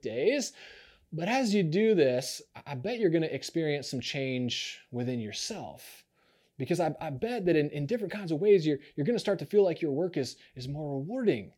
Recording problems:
none

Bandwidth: 17 kHz